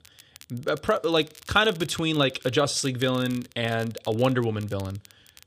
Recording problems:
crackle, like an old record; faint; 20 dB below the speech

